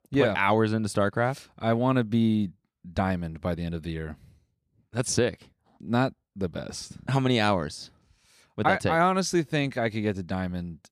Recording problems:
none

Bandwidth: 15 kHz